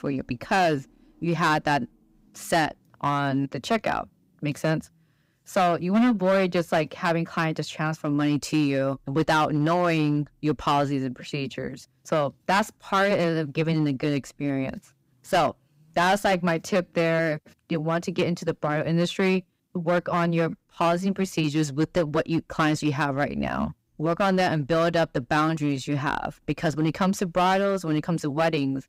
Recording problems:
distortion; slight; 6% of the sound clipped

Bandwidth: 15.5 kHz